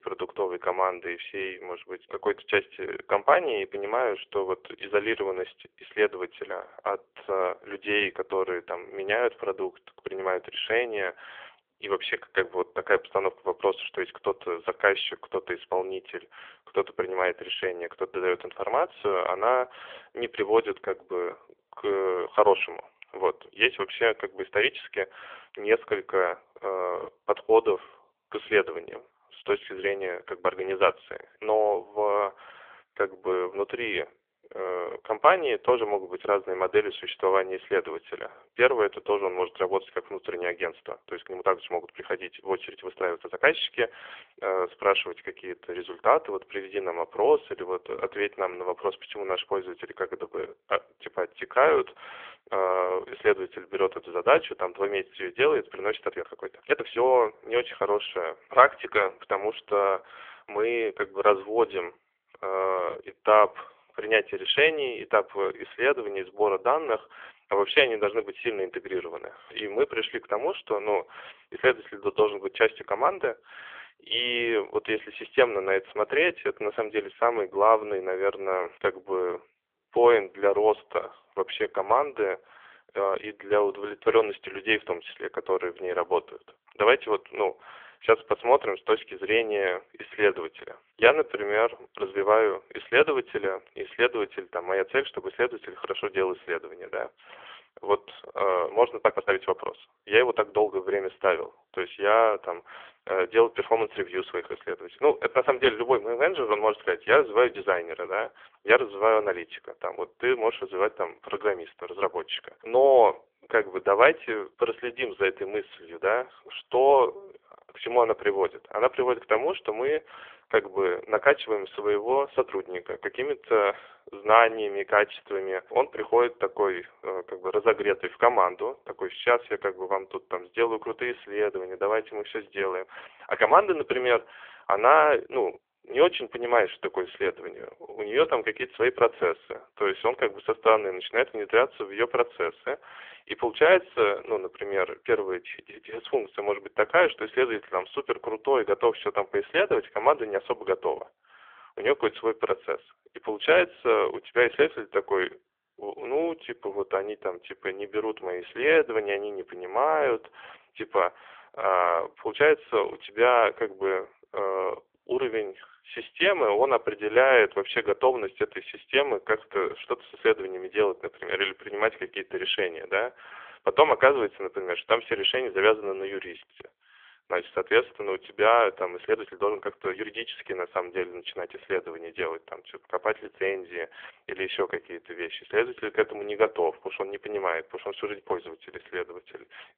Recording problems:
phone-call audio; poor line; nothing above 3.5 kHz
uneven, jittery; strongly; from 29 s to 3:00

